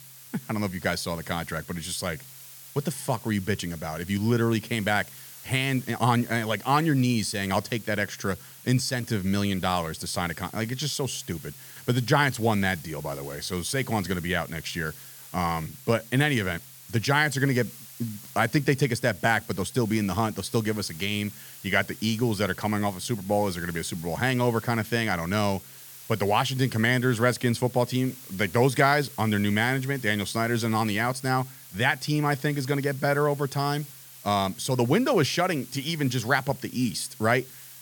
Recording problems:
hiss; noticeable; throughout; 15 dB below the speech

